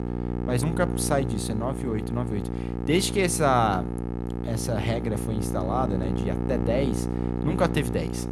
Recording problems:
electrical hum; loud; throughout; 60 Hz, 7 dB below the speech

